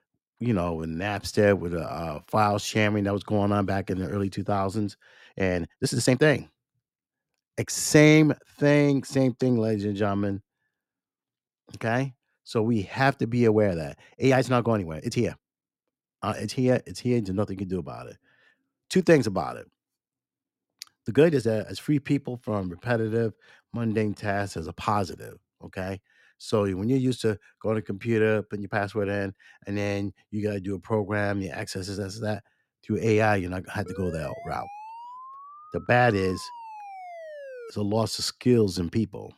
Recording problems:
uneven, jittery; strongly; from 0.5 to 39 s
siren; faint; from 34 to 38 s; peak 15 dB below the speech

